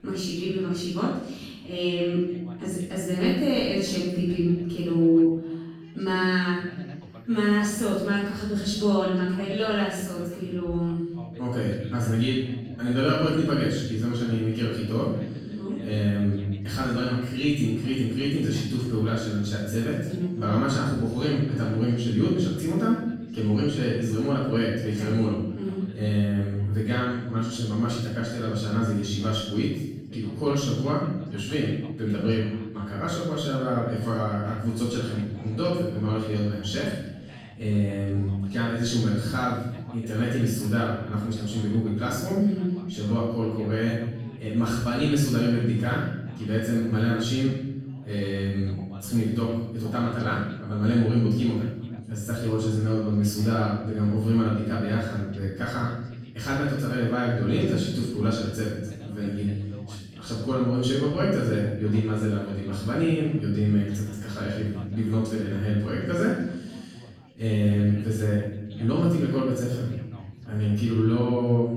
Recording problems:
room echo; strong; dies away in 0.9 s
off-mic speech; far
background chatter; faint; throughout; 4 voices, 20 dB below the speech

